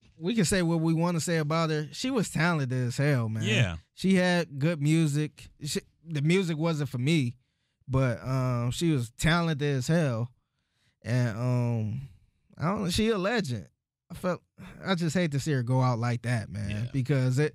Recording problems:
none

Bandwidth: 15.5 kHz